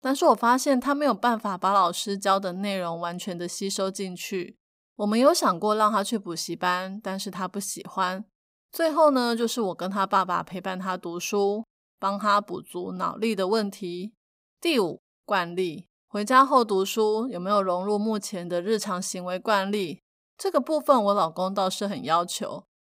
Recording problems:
none

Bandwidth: 15.5 kHz